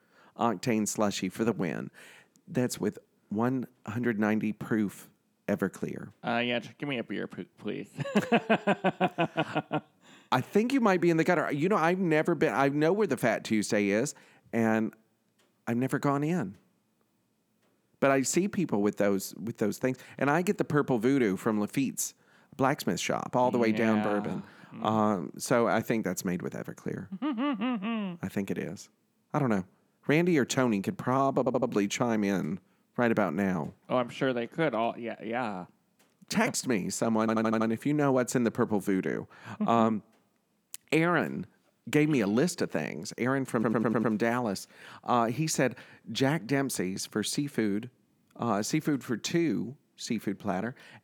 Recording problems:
audio stuttering; at 31 s, at 37 s and at 44 s

